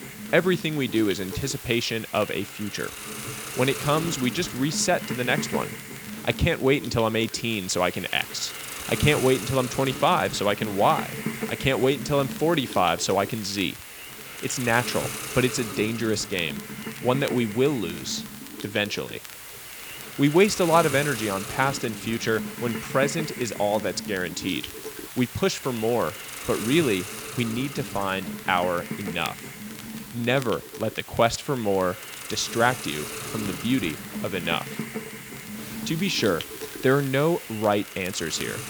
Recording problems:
hiss; loud; throughout; 9 dB below the speech
crackle, like an old record; faint; 25 dB below the speech

